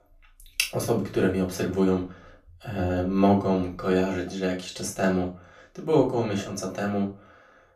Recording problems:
off-mic speech; far
room echo; slight; dies away in 0.3 s

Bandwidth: 14.5 kHz